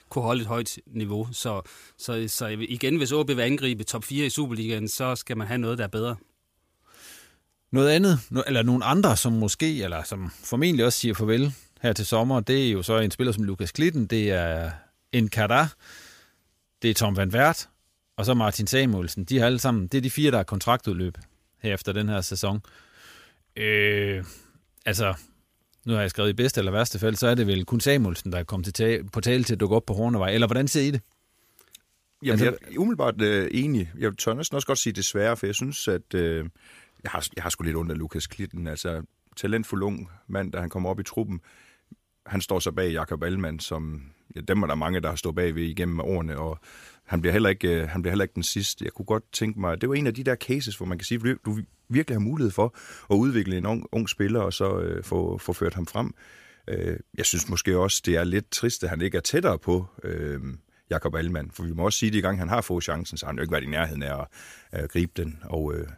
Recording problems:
none

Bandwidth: 15 kHz